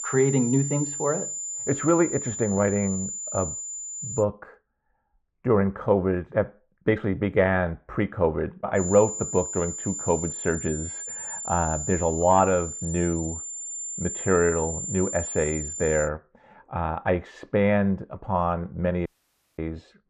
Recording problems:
muffled; very; fading above 3.5 kHz
high-pitched whine; loud; until 4 s and from 9 to 16 s; 7 kHz, 5 dB below the speech
audio cutting out; at 19 s for 0.5 s

